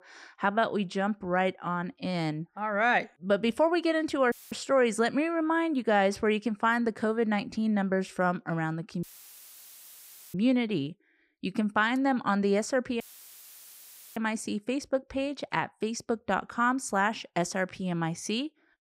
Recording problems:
audio cutting out; filled with static; at 4.5 s, at 9 s for 1.5 s and at 13 s for 1 s

